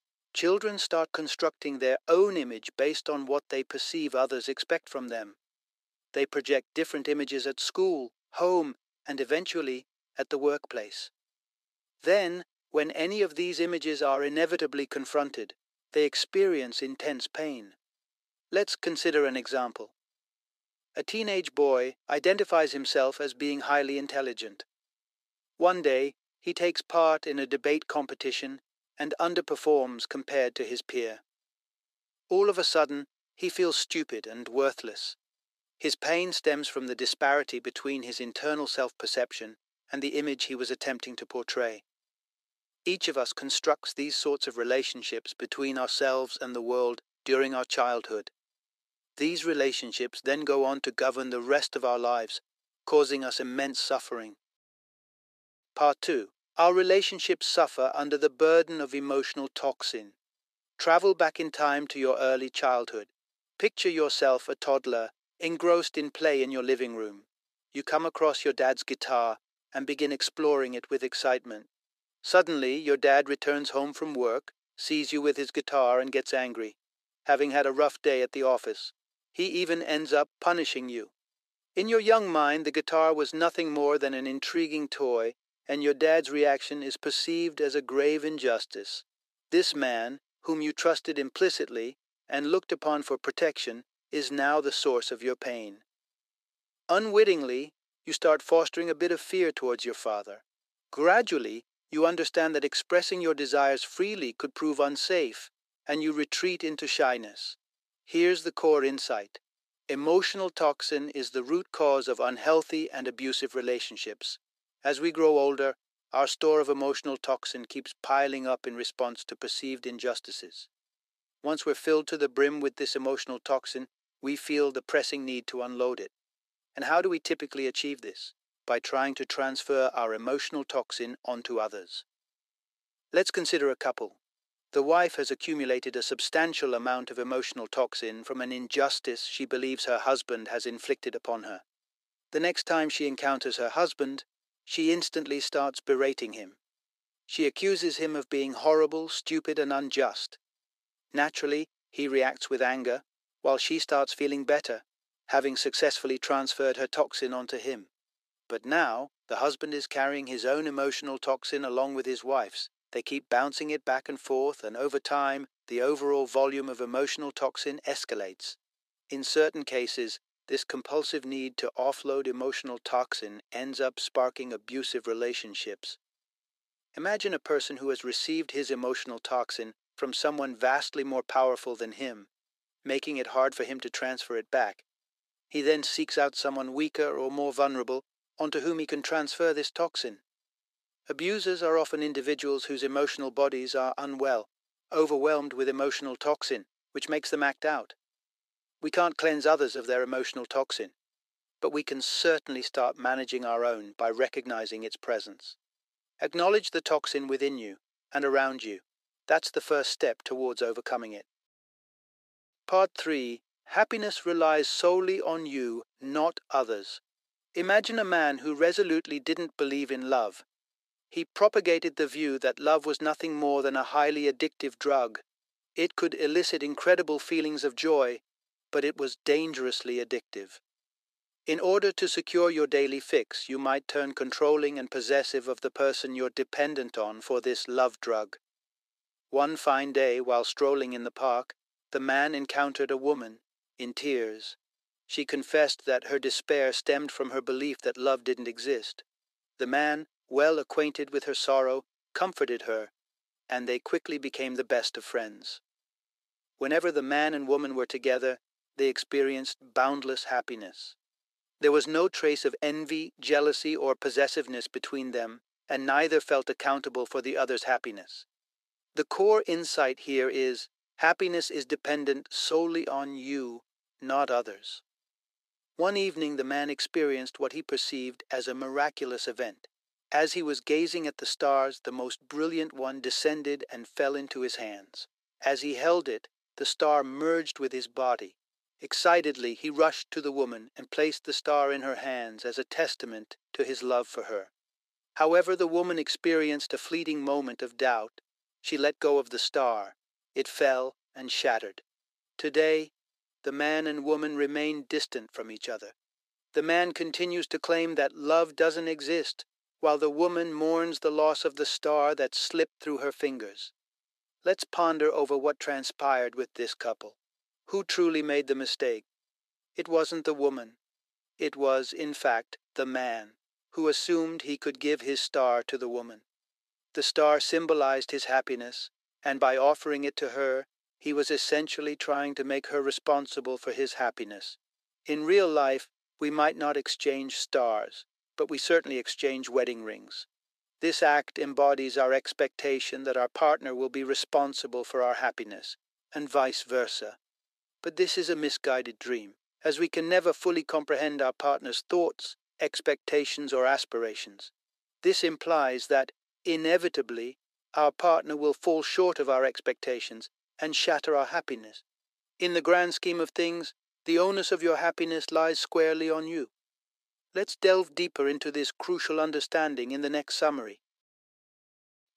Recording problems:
thin; very; fading below 400 Hz

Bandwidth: 14.5 kHz